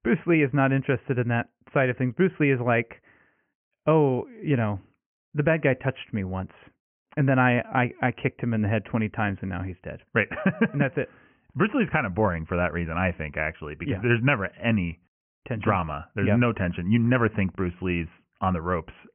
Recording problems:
high frequencies cut off; severe; nothing above 3 kHz

